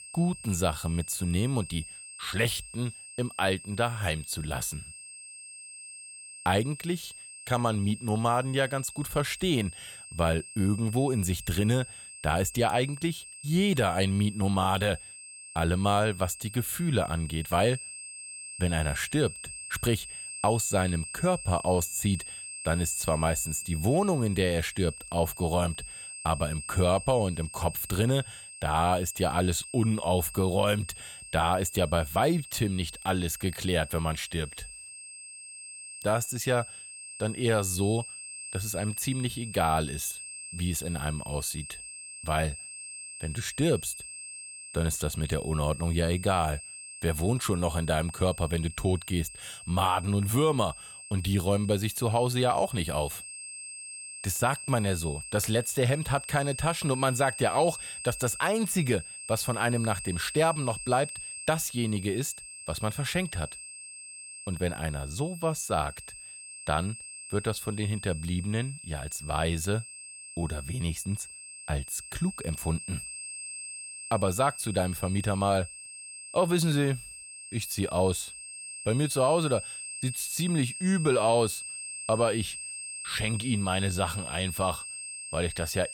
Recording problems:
high-pitched whine; noticeable; throughout; 8.5 kHz, 10 dB below the speech

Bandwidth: 17 kHz